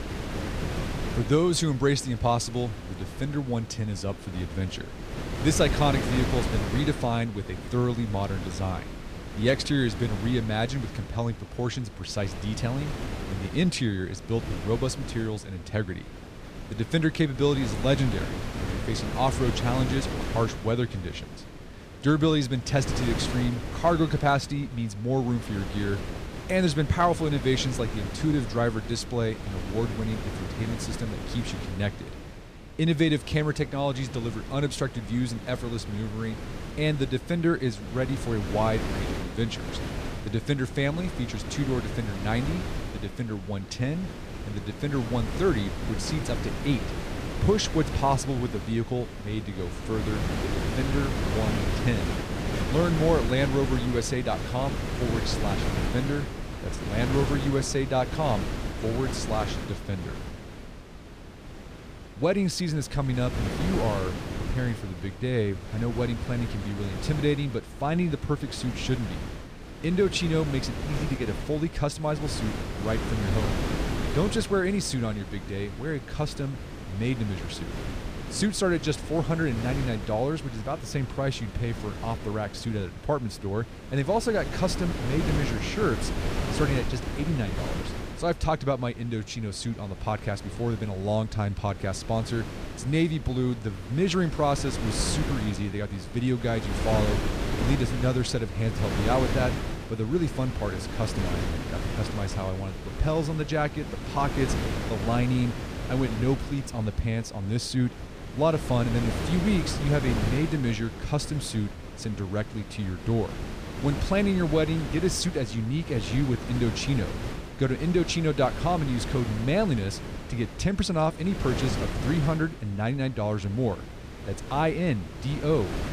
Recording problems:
wind noise on the microphone; heavy; 7 dB below the speech

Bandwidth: 15 kHz